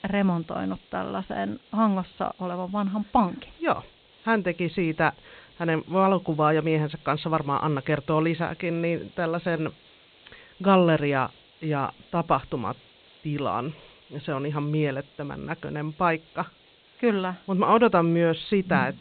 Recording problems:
high frequencies cut off; severe; nothing above 4 kHz
hiss; faint; throughout; 30 dB below the speech

